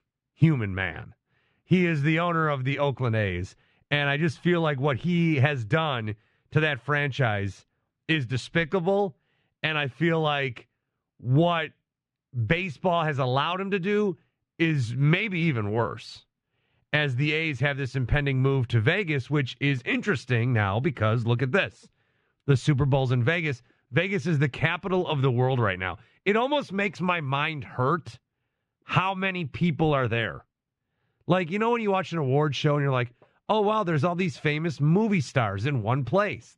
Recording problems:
muffled; slightly; fading above 2.5 kHz

